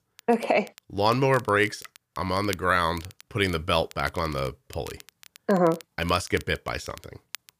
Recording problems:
crackle, like an old record; faint; 20 dB below the speech

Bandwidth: 15 kHz